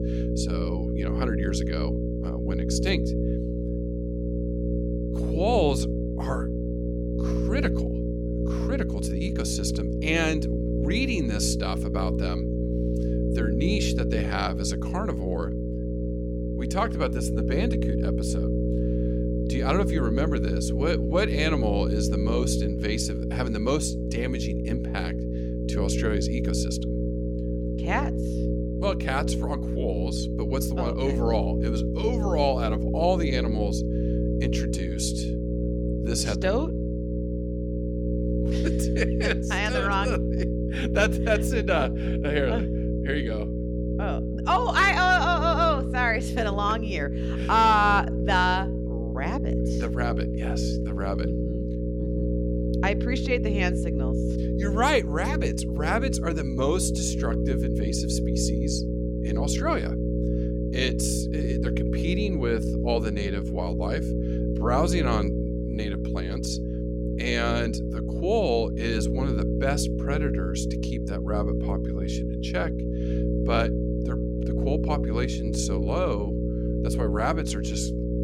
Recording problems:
electrical hum; loud; throughout; 60 Hz, 6 dB below the speech

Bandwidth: 17.5 kHz